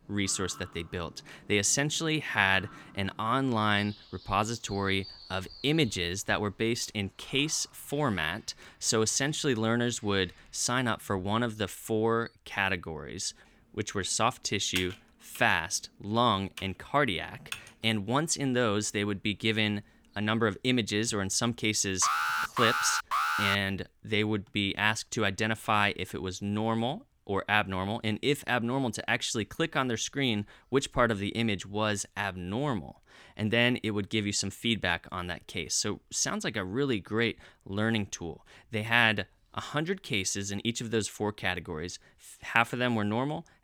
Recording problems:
animal sounds; faint; until 11 s; 20 dB below the speech
keyboard typing; noticeable; from 15 to 18 s; peak 8 dB below the speech
alarm; loud; from 22 to 24 s; peak 2 dB above the speech

